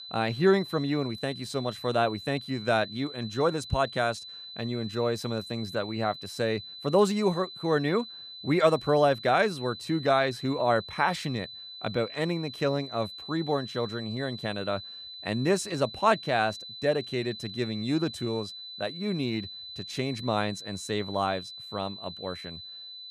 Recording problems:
high-pitched whine; noticeable; throughout; 4 kHz, 10 dB below the speech

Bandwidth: 15 kHz